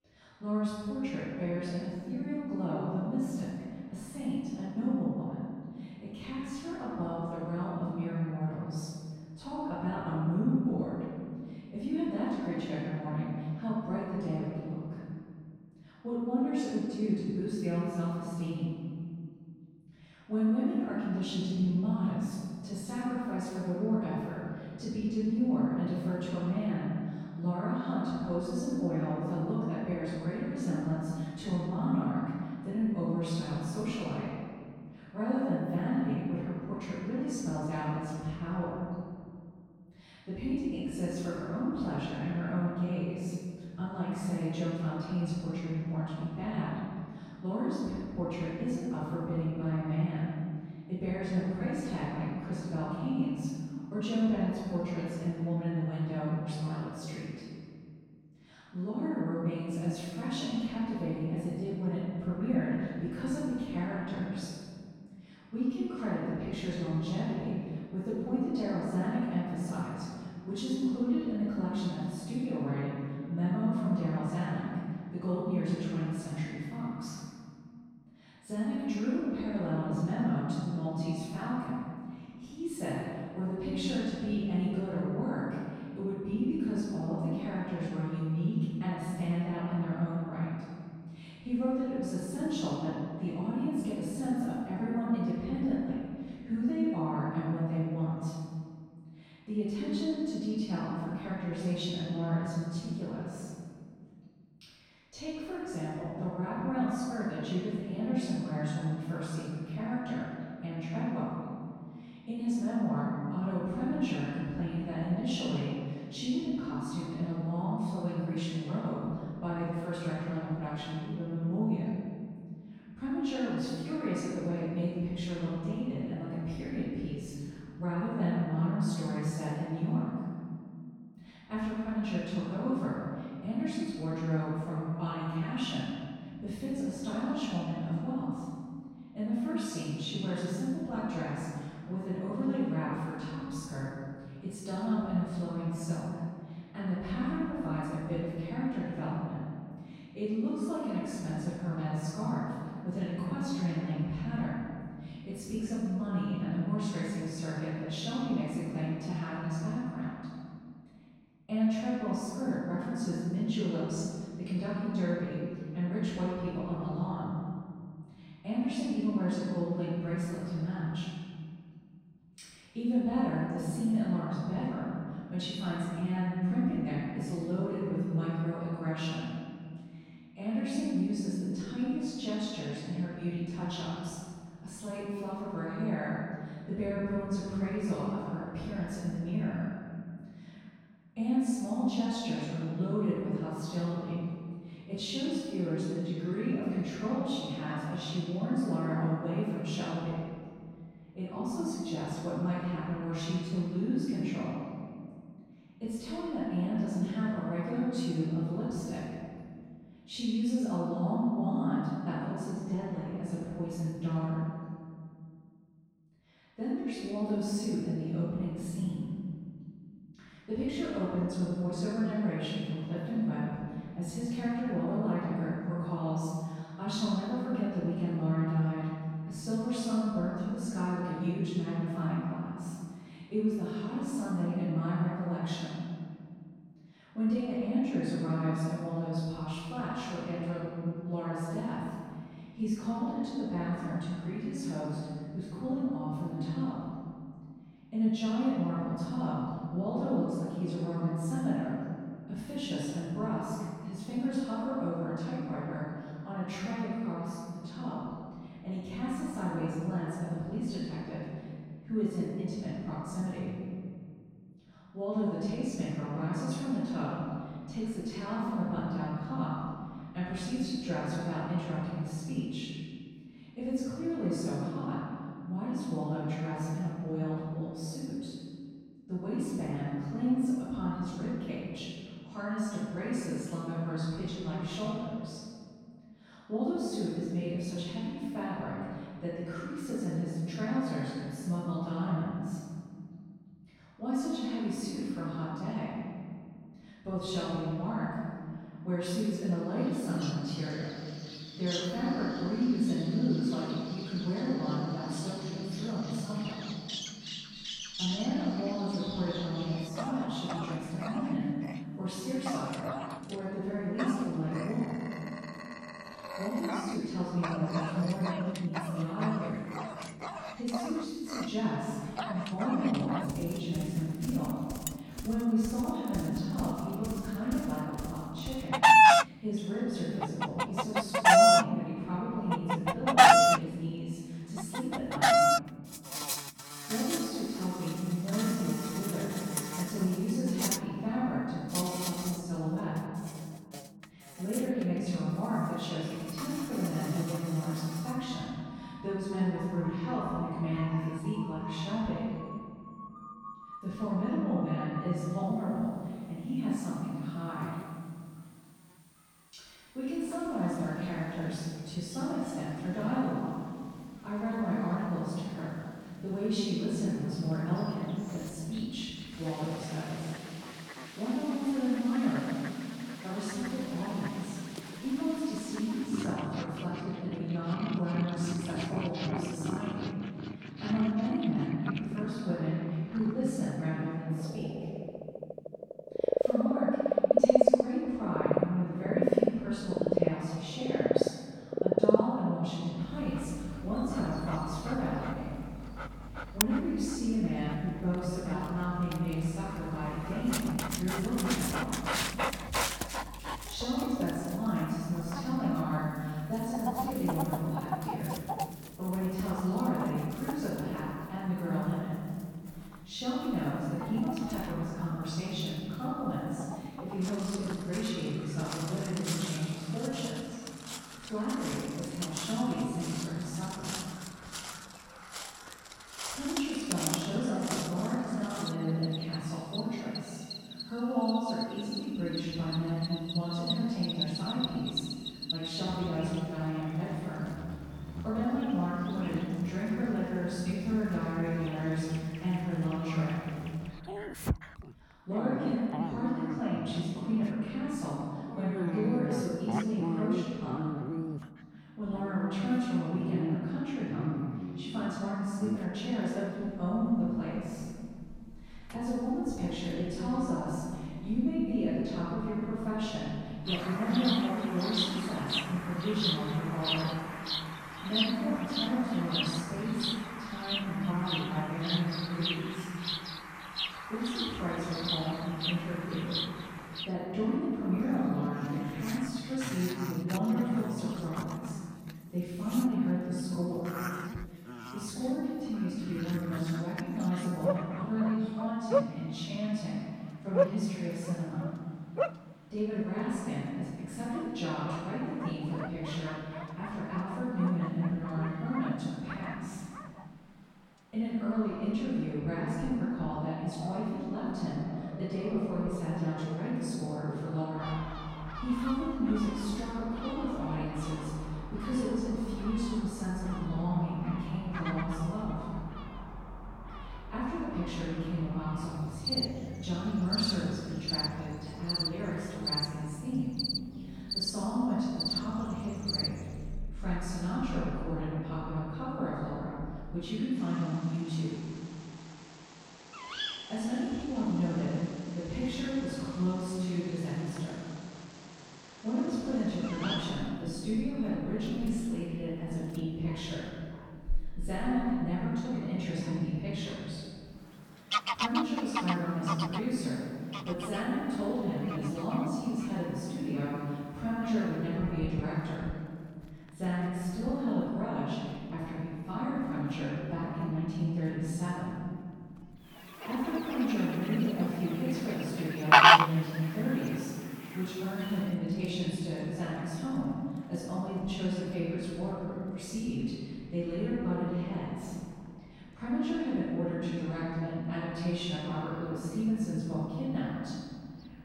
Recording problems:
room echo; strong; dies away in 2.2 s
off-mic speech; far
animal sounds; very loud; from 5:00 on; as loud as the speech

